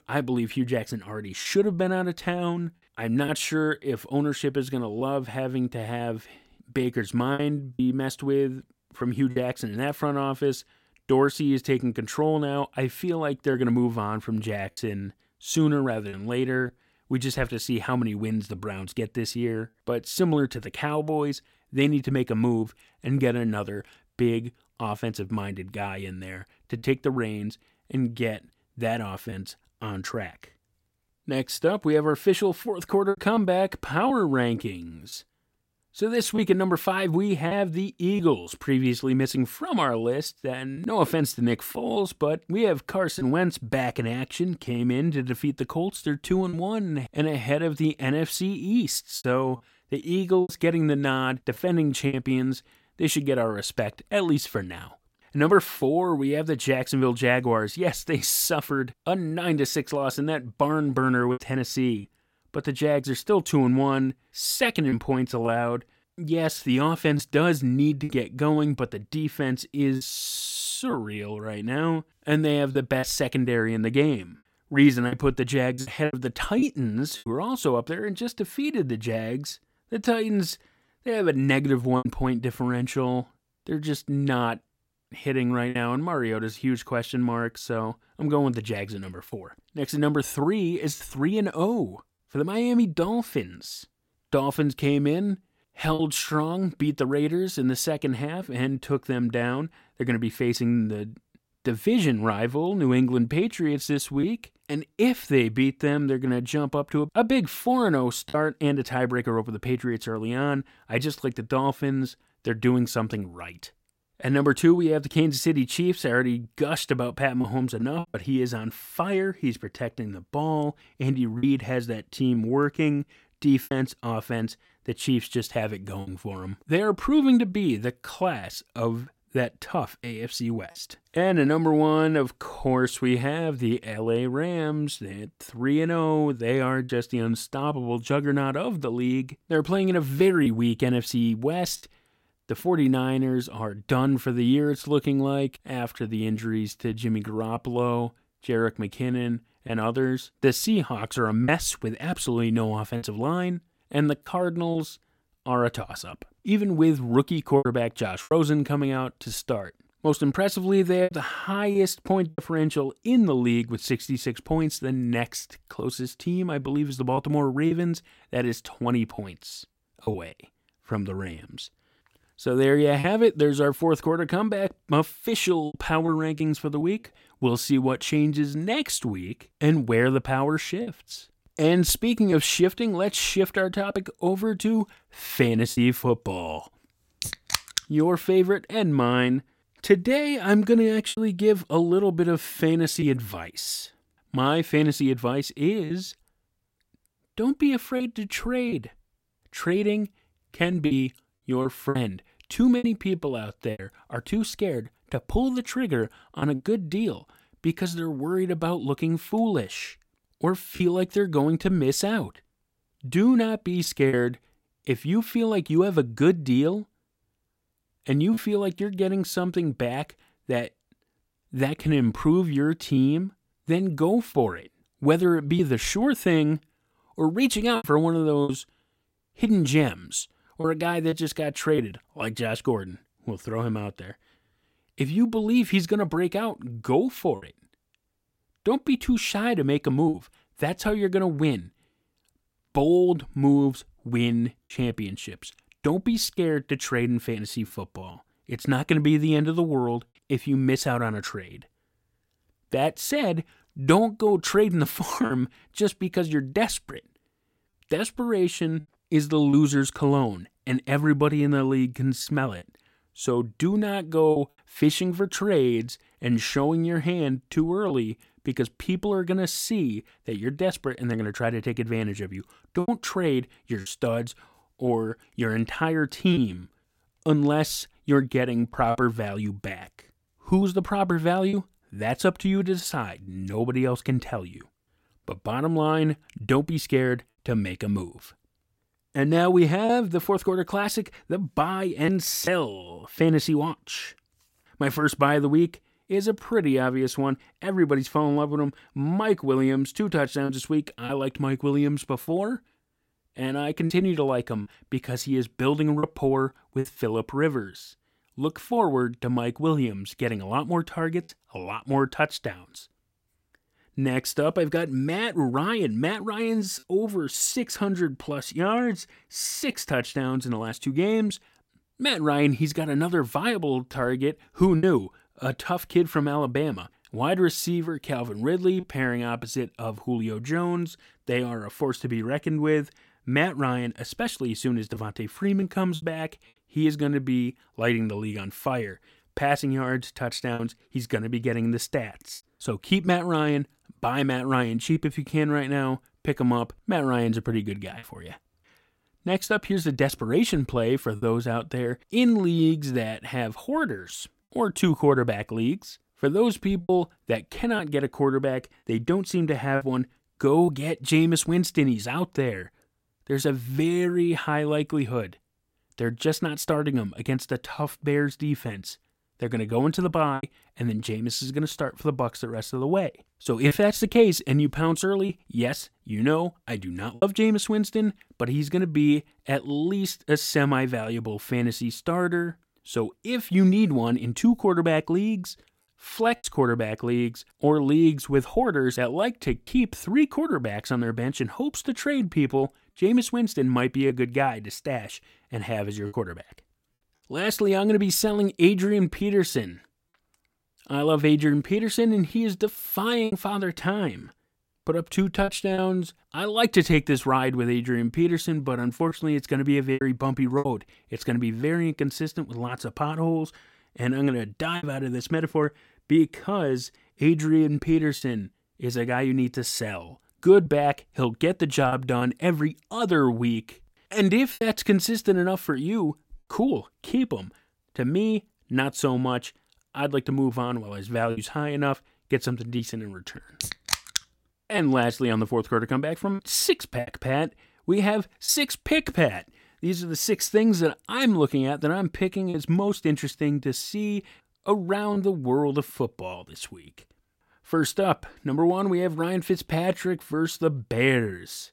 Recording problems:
choppy; occasionally; 2% of the speech affected

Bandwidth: 16.5 kHz